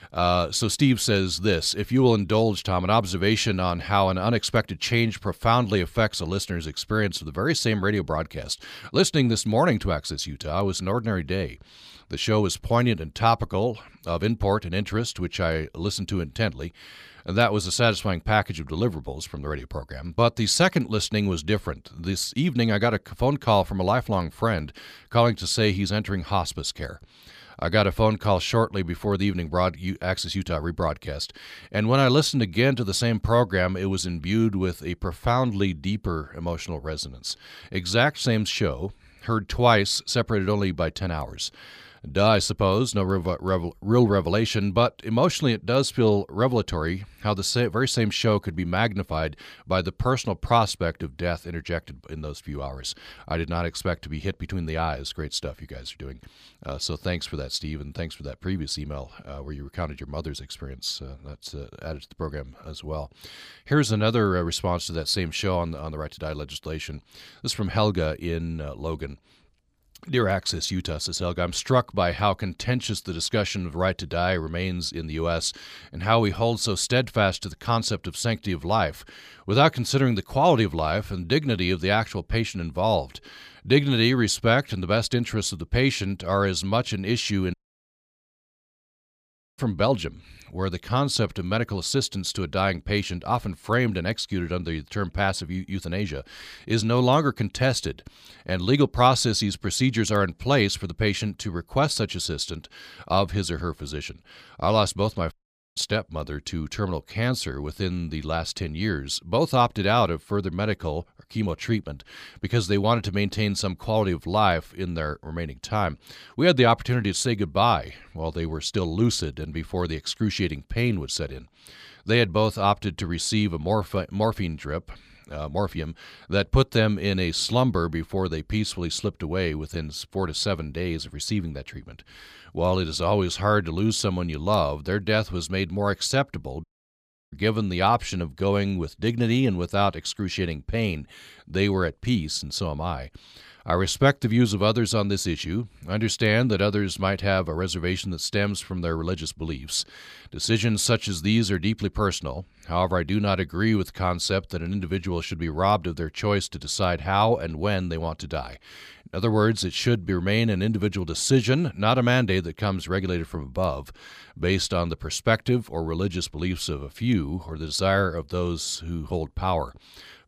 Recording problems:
audio cutting out; at 1:28 for 2 s, at 1:45 and at 2:17 for 0.5 s

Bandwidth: 15 kHz